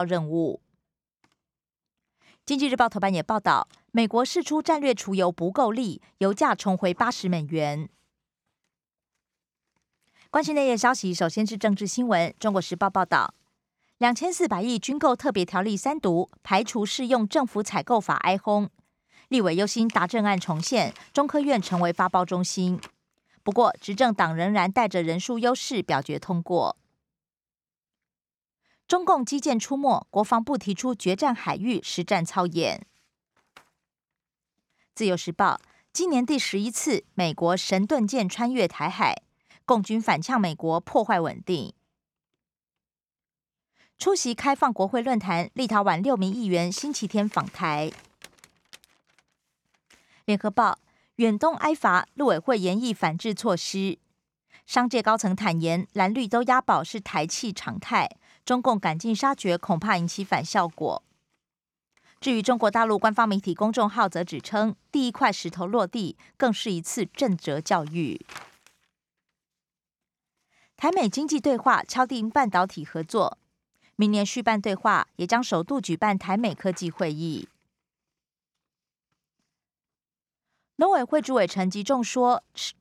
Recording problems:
abrupt cut into speech; at the start

